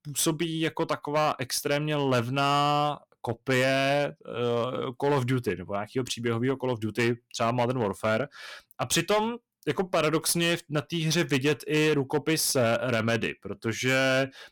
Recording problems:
distortion; slight; 8% of the sound clipped

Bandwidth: 17.5 kHz